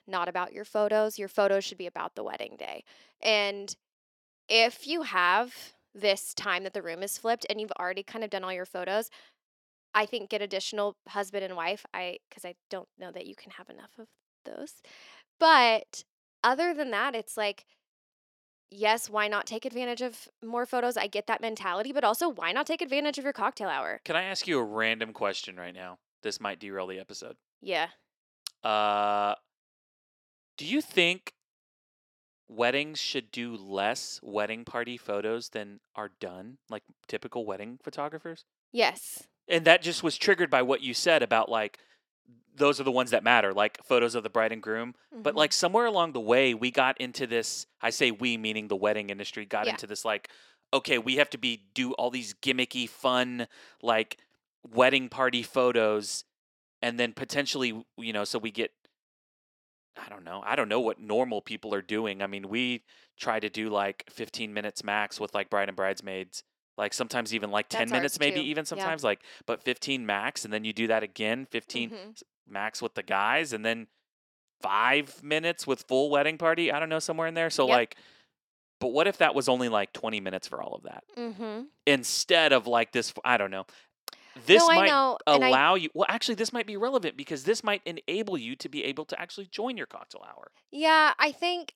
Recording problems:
thin; somewhat; fading below 400 Hz

